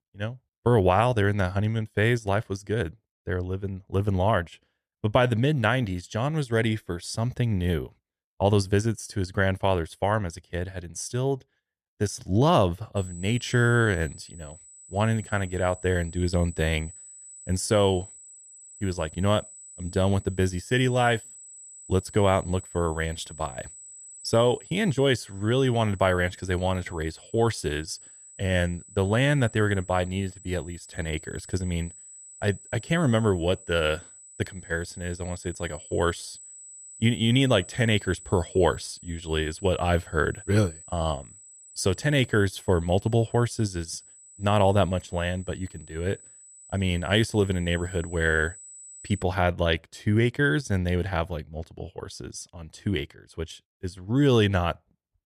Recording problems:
high-pitched whine; noticeable; from 13 to 49 s; 8 kHz, 20 dB below the speech

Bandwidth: 14.5 kHz